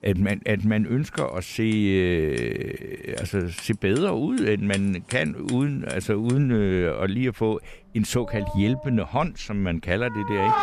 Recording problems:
household noises; noticeable; throughout; 10 dB below the speech

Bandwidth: 14.5 kHz